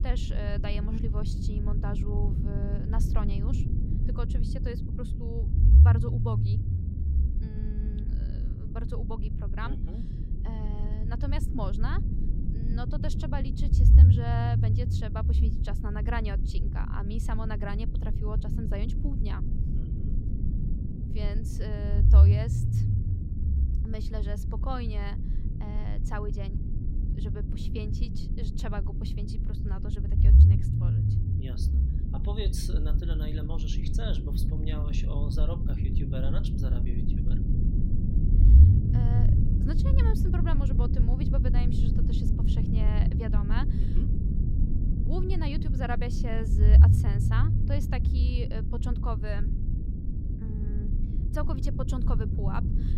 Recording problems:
low rumble; loud; throughout; 1 dB below the speech

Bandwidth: 16 kHz